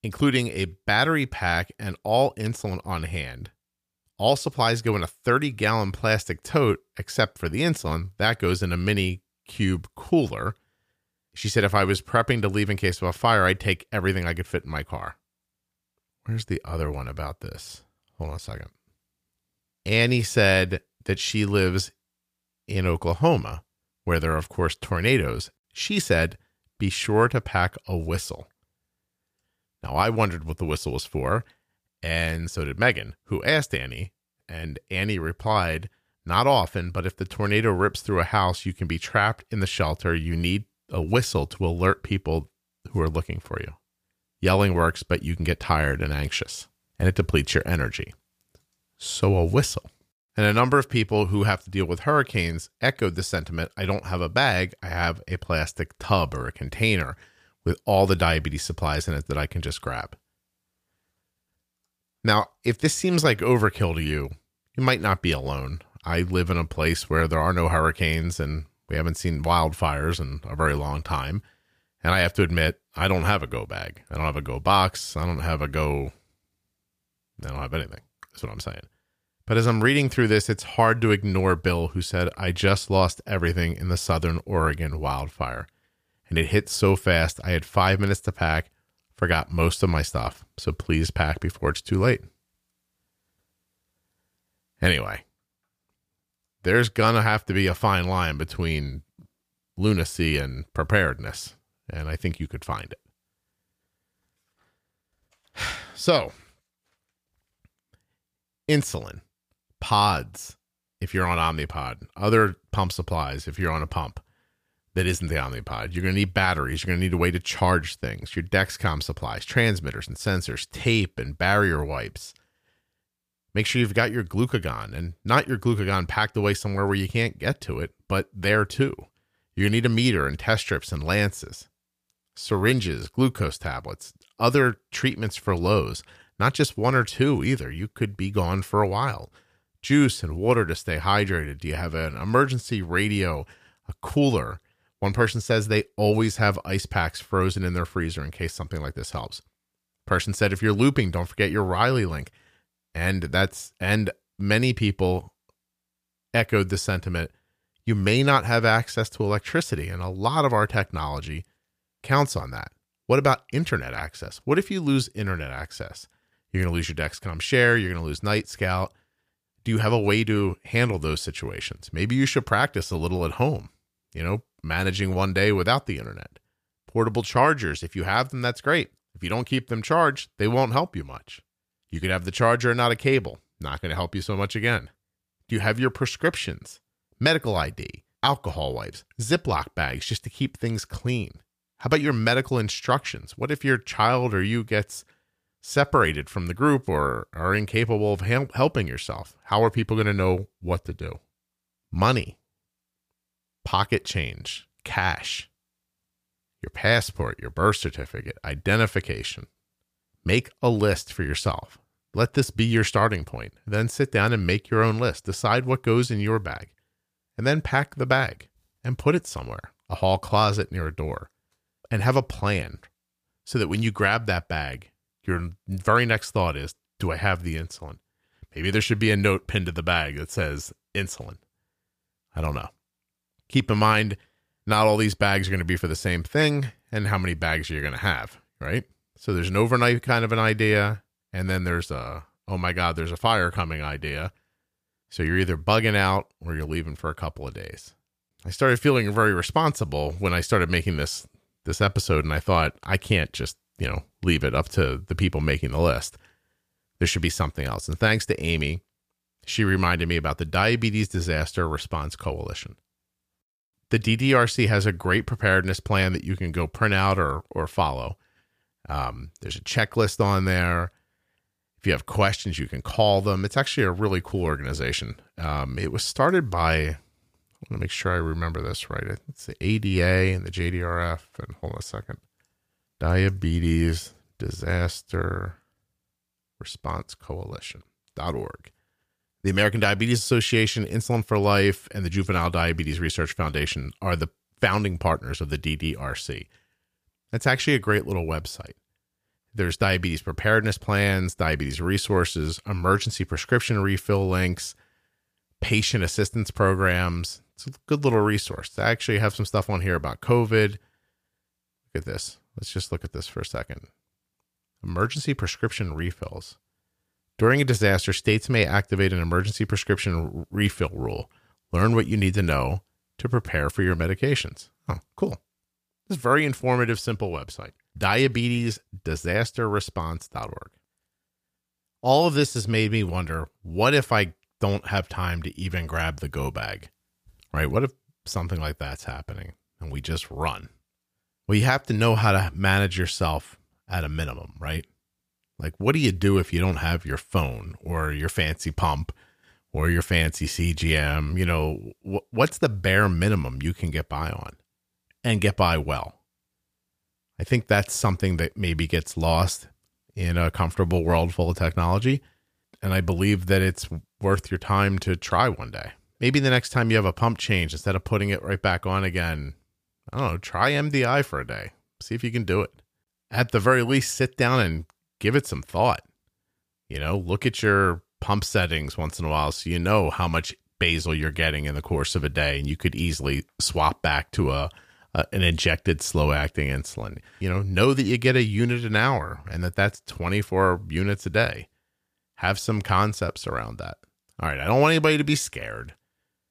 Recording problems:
none

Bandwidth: 15 kHz